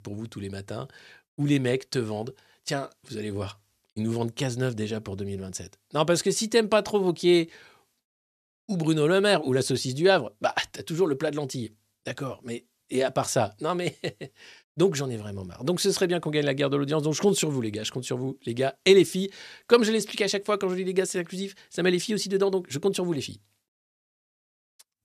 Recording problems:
none

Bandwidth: 14 kHz